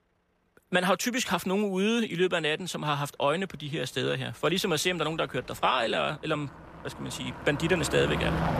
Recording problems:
traffic noise; loud; throughout; 9 dB below the speech

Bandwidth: 14.5 kHz